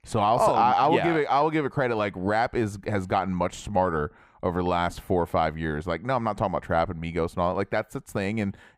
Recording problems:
muffled; slightly; fading above 3.5 kHz

